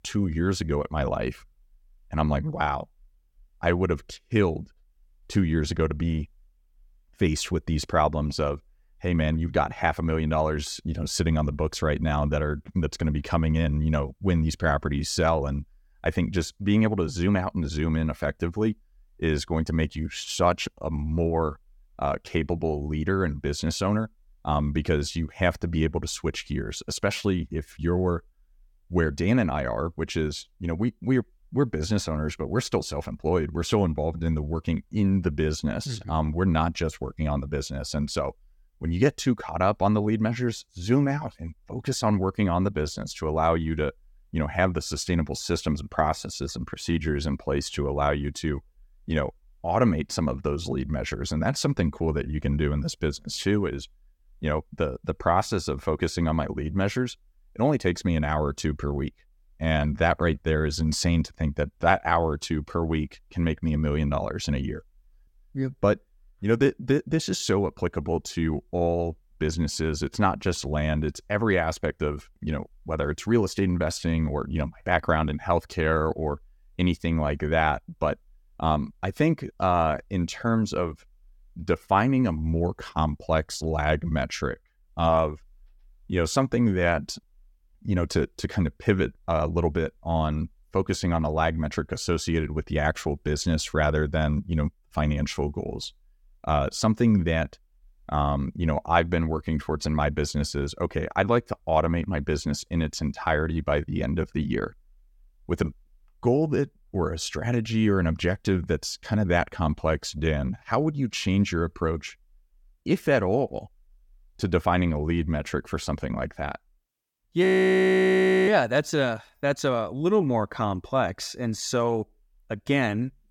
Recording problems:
audio freezing; at 1:57 for 1 s

